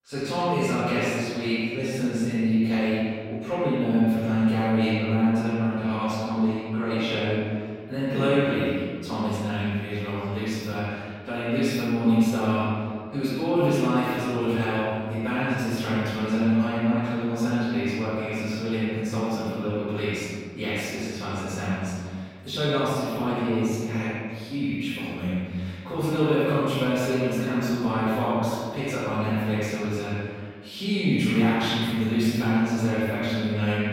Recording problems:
echo of what is said; strong; throughout; 90 ms later, 10 dB below the speech
room echo; strong; dies away in 1.7 s
off-mic speech; far

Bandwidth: 16 kHz